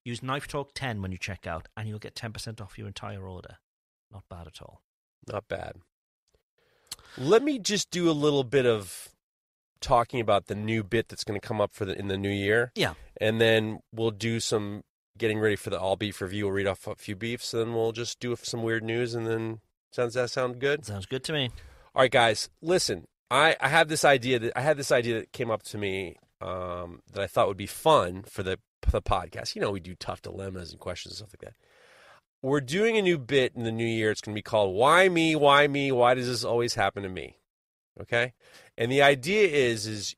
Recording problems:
none

